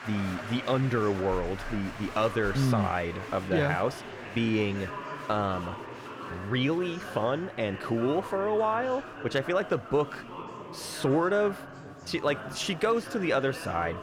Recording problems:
chatter from many people; noticeable; throughout; 10 dB below the speech

